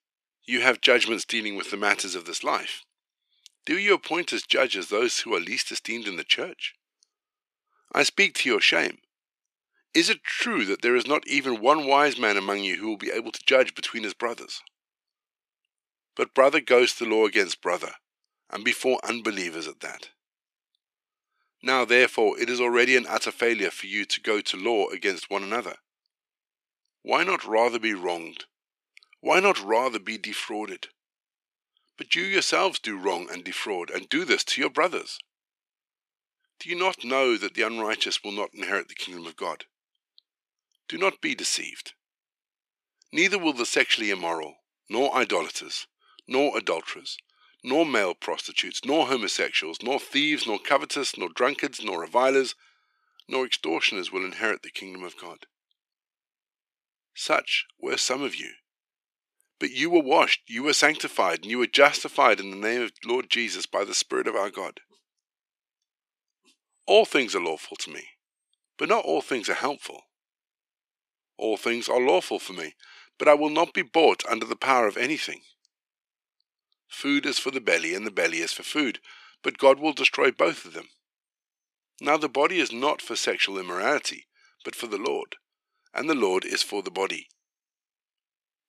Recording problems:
thin; very; fading below 350 Hz

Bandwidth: 14.5 kHz